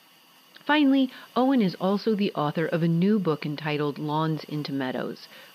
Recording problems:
high frequencies cut off; noticeable; nothing above 5.5 kHz
hiss; faint; throughout; 25 dB below the speech

